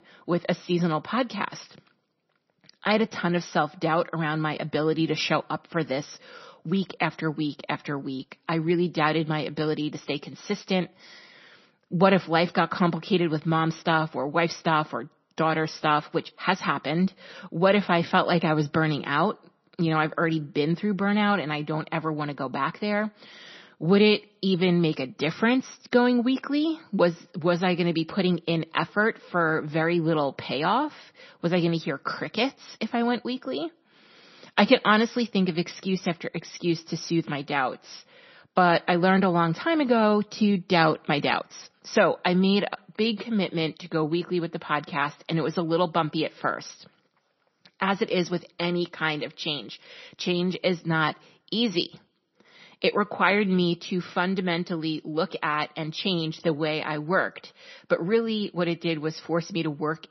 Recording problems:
garbled, watery; slightly; nothing above 6 kHz

